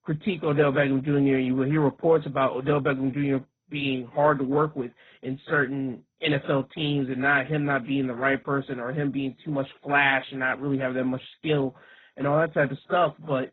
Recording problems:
garbled, watery; badly; nothing above 4 kHz

